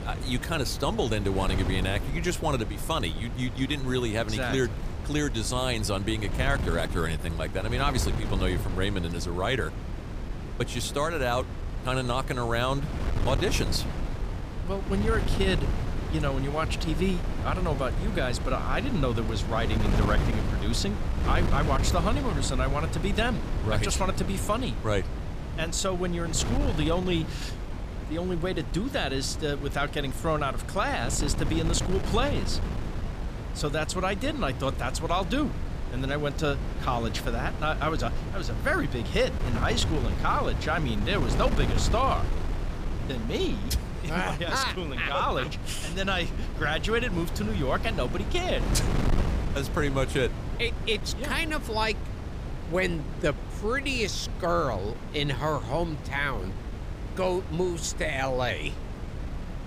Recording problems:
wind noise on the microphone; heavy; 10 dB below the speech

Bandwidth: 15 kHz